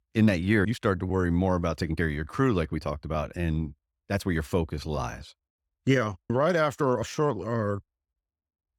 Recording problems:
uneven, jittery; strongly; from 0.5 to 8 s

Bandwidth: 17.5 kHz